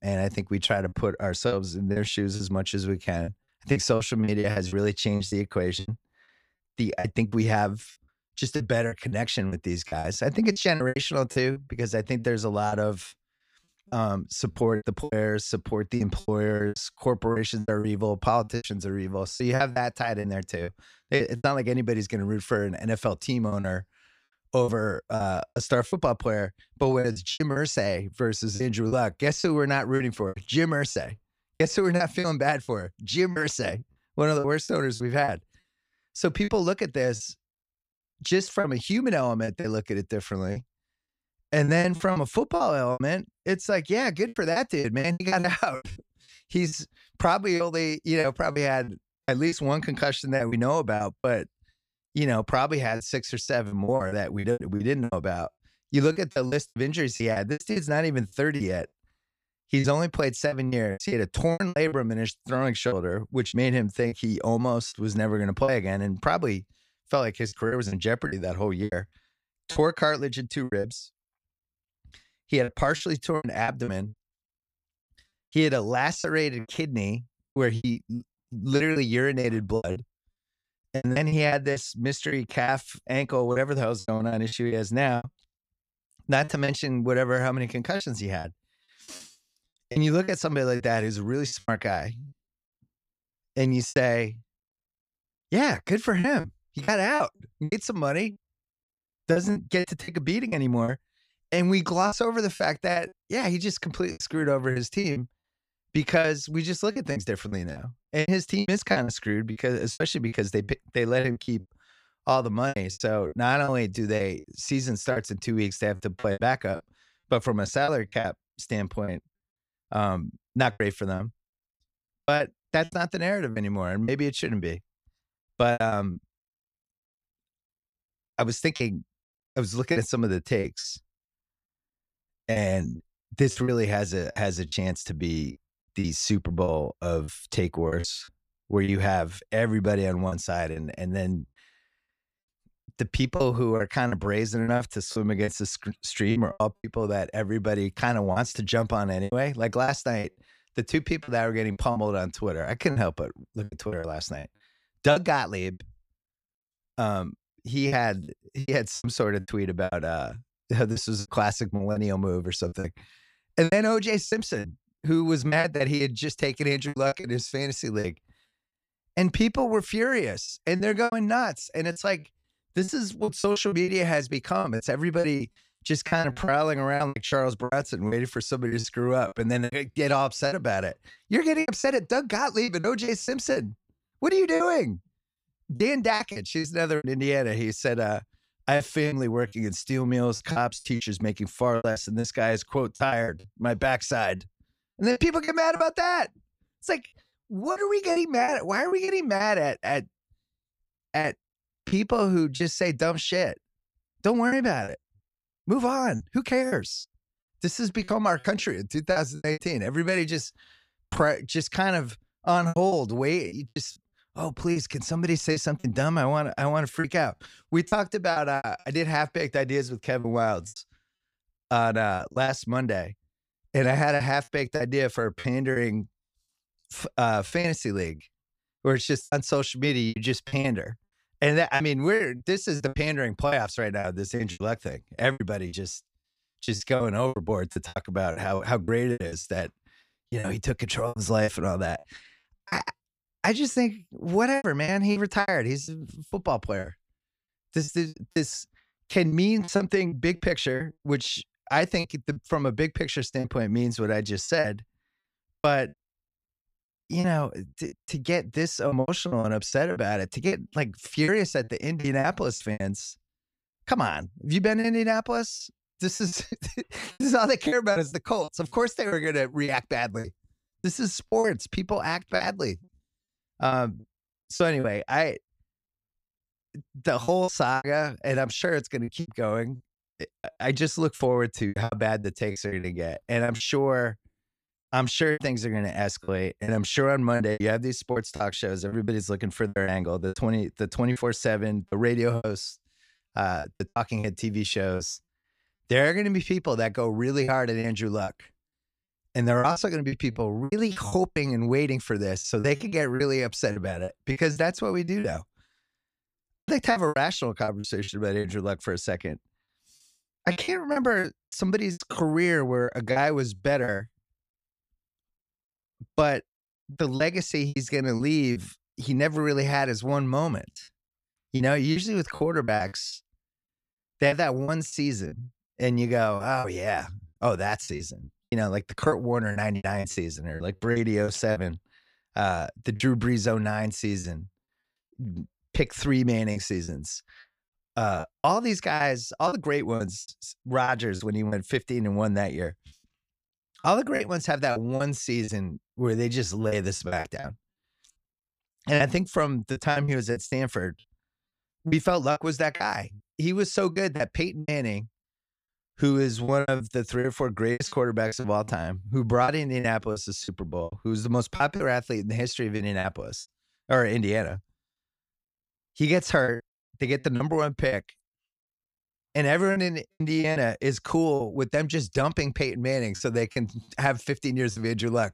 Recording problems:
choppy; very; 11% of the speech affected

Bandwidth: 15 kHz